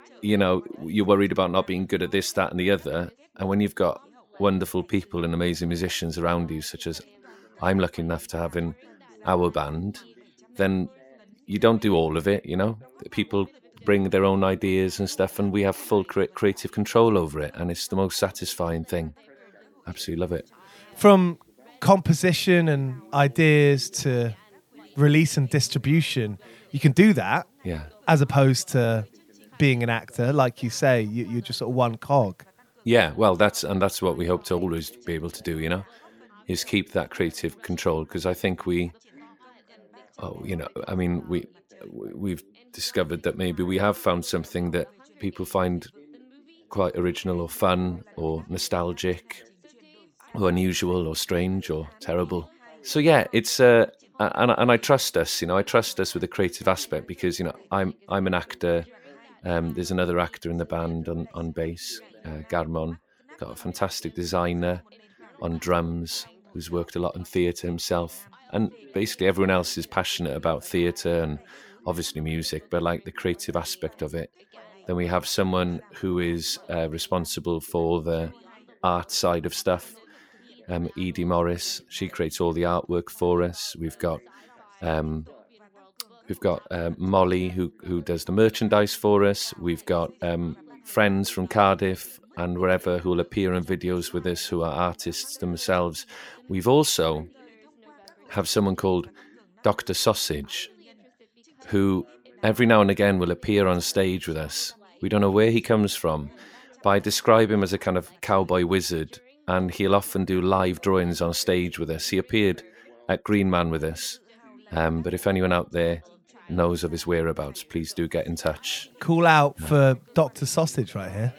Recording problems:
background chatter; faint; throughout; 3 voices, 30 dB below the speech

